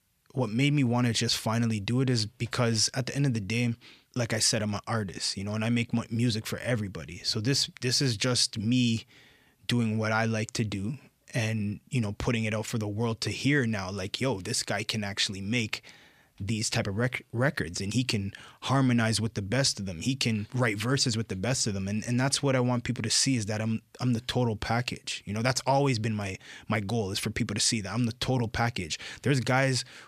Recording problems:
none

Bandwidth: 14.5 kHz